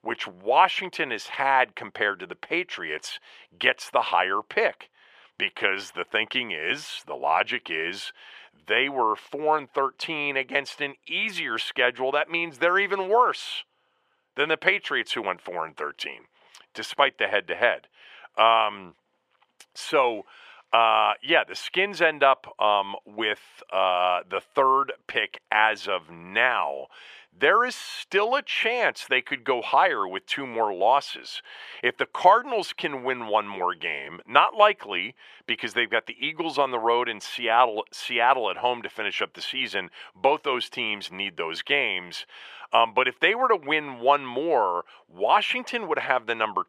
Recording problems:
thin; very; fading below 500 Hz

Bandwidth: 14.5 kHz